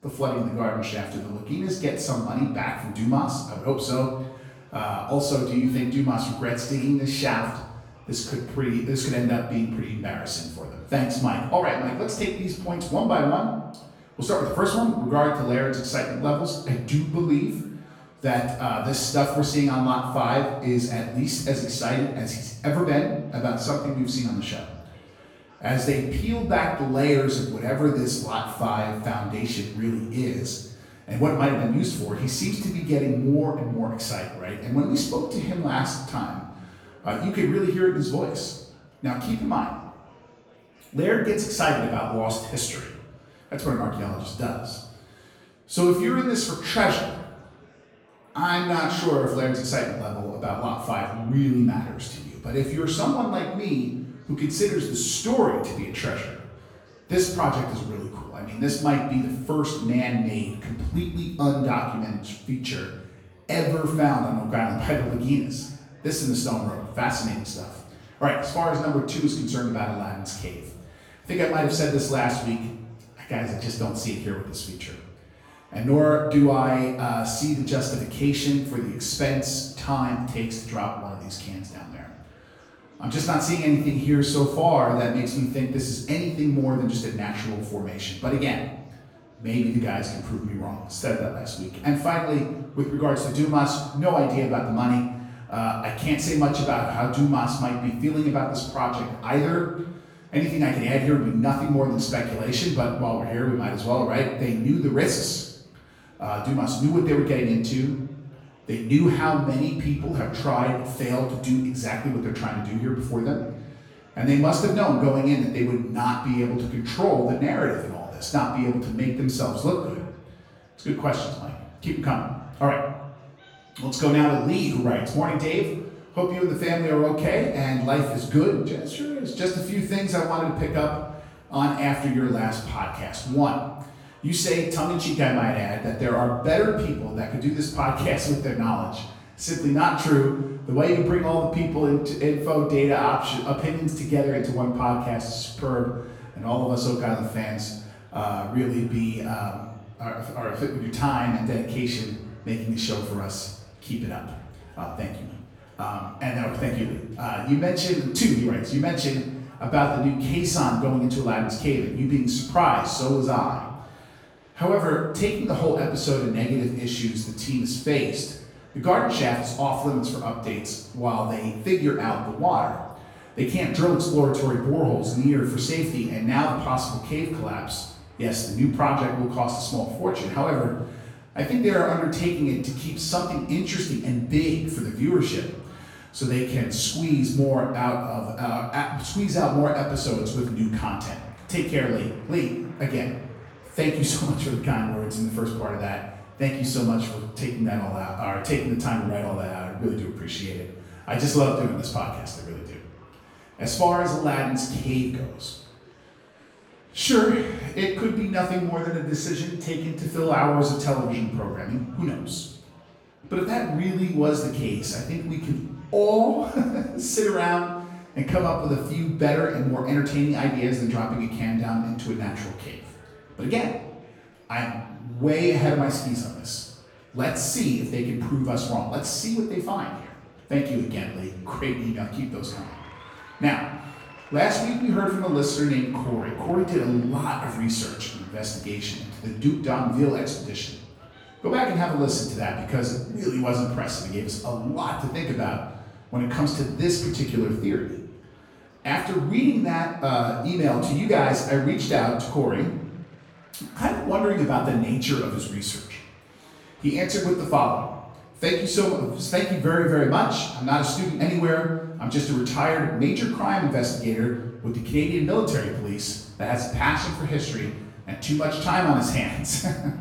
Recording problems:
off-mic speech; far
room echo; noticeable; dies away in 0.9 s
murmuring crowd; faint; throughout; 30 dB below the speech

